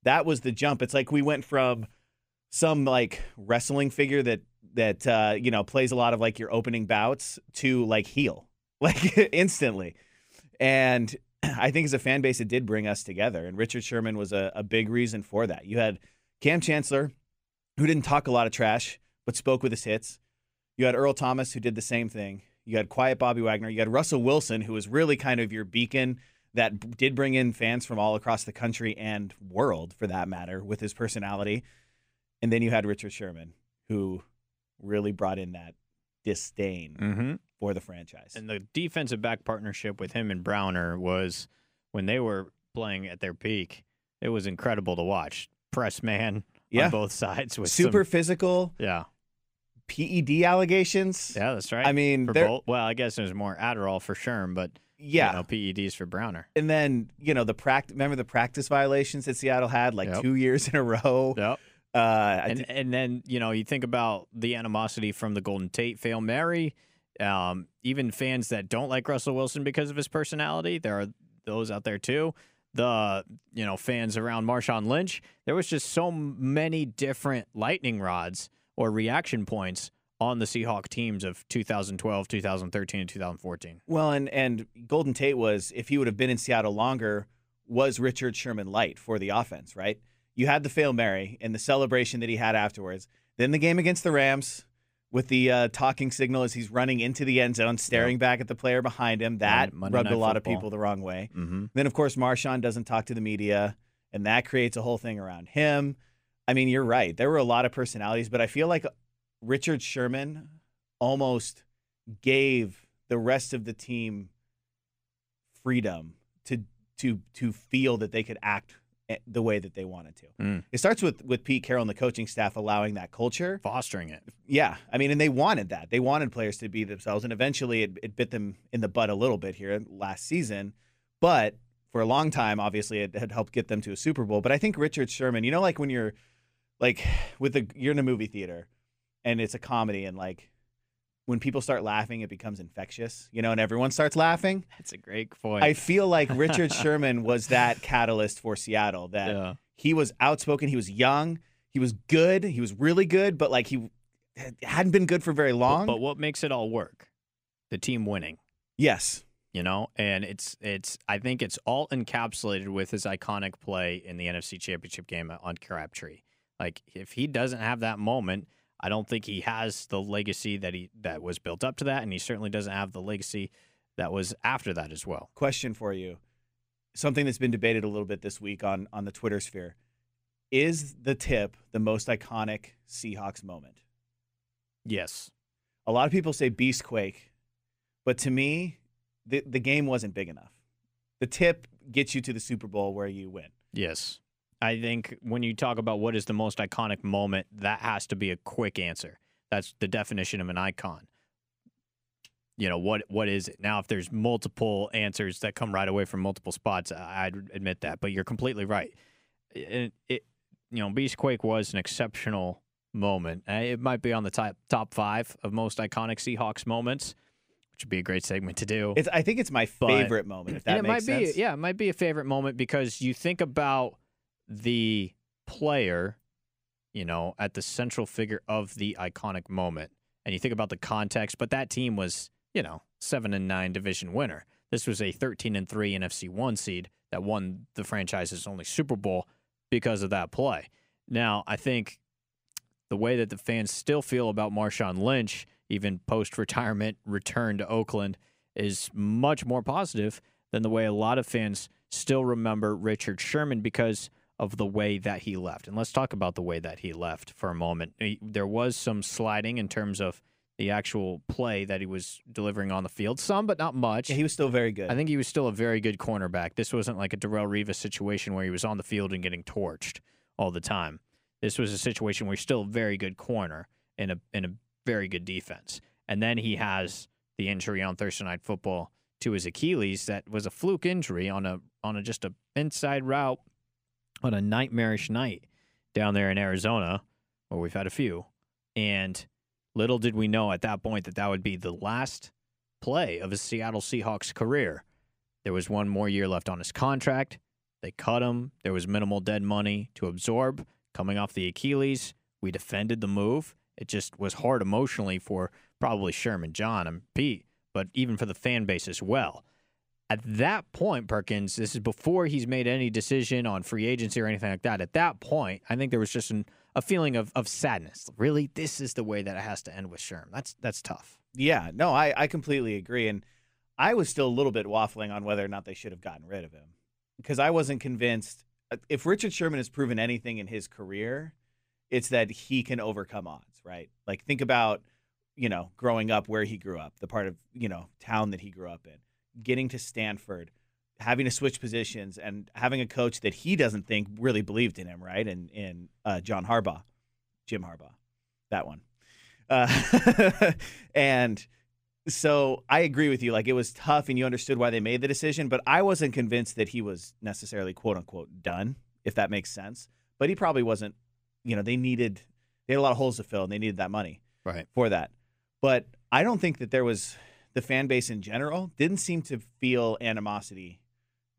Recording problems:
none

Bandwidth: 15.5 kHz